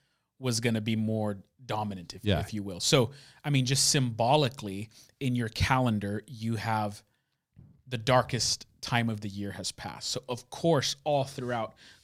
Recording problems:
none

